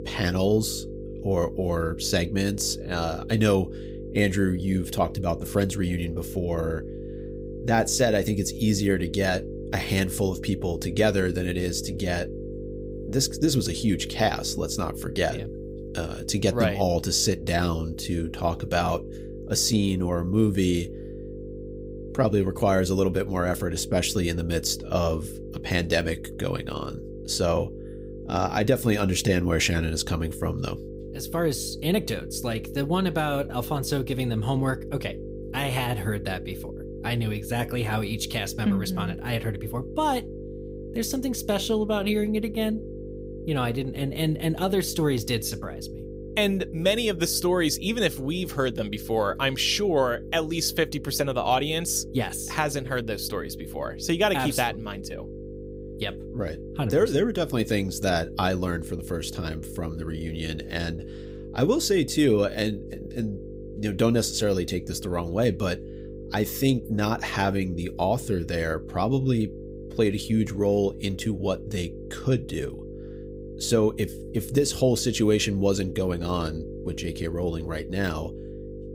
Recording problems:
electrical hum; noticeable; throughout; 50 Hz, 15 dB below the speech

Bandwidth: 15.5 kHz